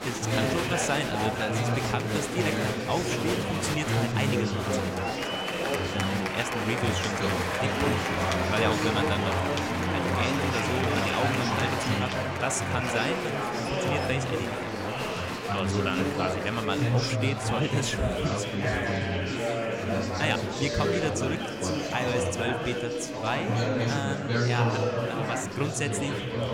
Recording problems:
murmuring crowd; very loud; throughout; 4 dB above the speech

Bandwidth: 16 kHz